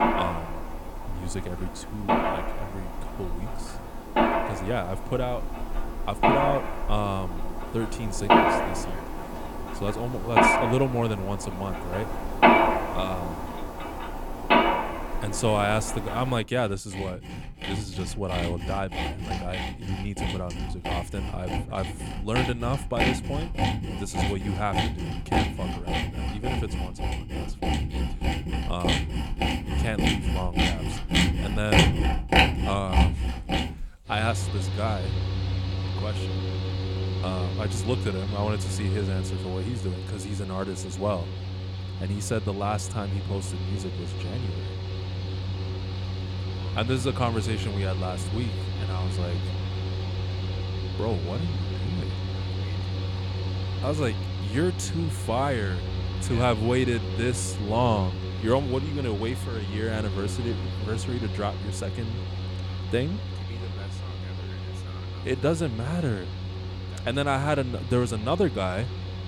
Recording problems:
machinery noise; very loud; throughout; 2 dB above the speech

